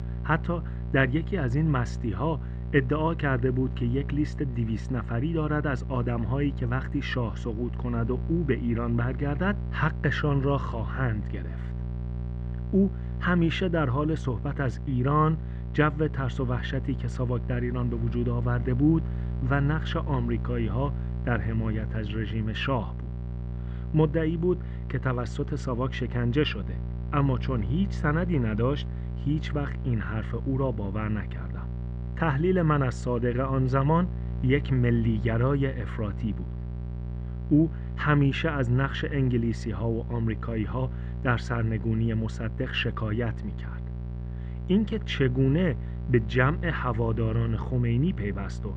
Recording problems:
muffled; very; fading above 2 kHz
electrical hum; noticeable; throughout; 60 Hz, 15 dB below the speech

